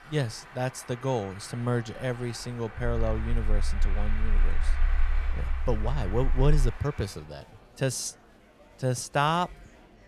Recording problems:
traffic noise; noticeable; throughout; 15 dB below the speech
murmuring crowd; faint; throughout; 25 dB below the speech
low rumble; faint; from 3 to 6.5 s; 25 dB below the speech

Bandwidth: 14.5 kHz